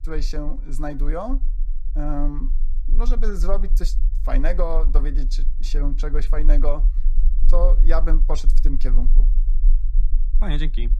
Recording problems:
low rumble; noticeable; throughout; 20 dB below the speech

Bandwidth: 15 kHz